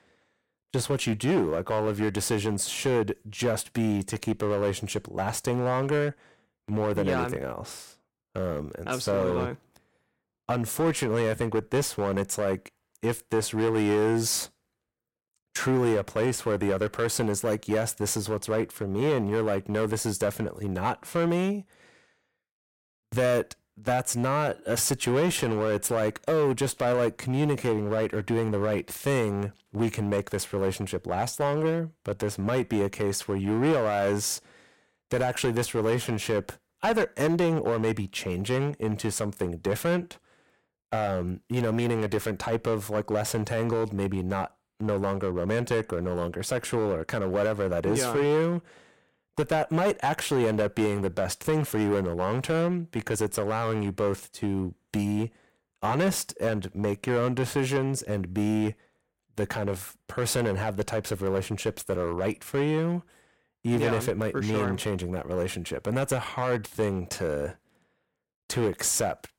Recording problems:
distortion; slight; 7% of the sound clipped

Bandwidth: 16.5 kHz